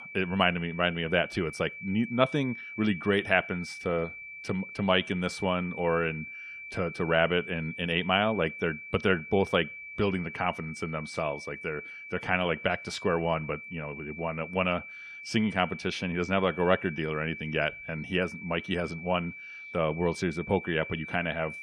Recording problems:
high-pitched whine; noticeable; throughout; 2.5 kHz, 10 dB below the speech

